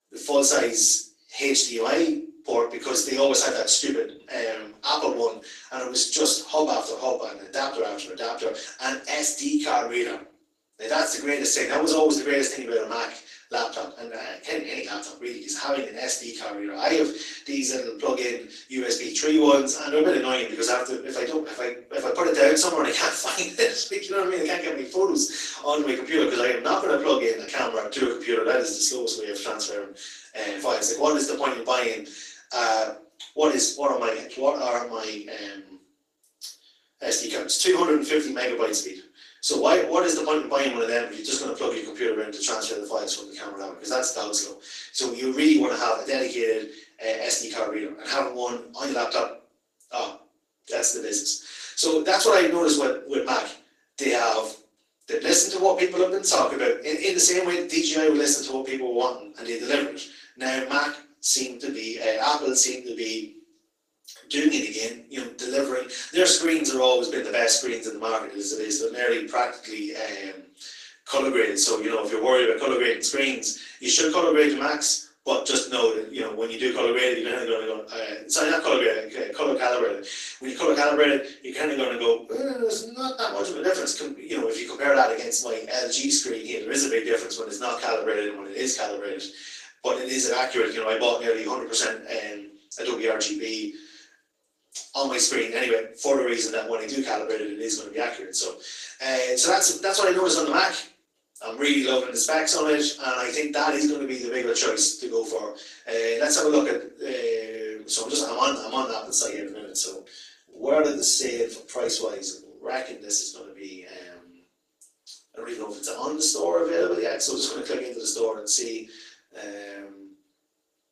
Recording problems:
off-mic speech; far
thin; somewhat; fading below 300 Hz
room echo; slight; dies away in 0.4 s
garbled, watery; slightly

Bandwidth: 15 kHz